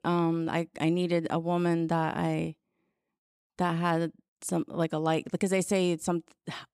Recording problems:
none

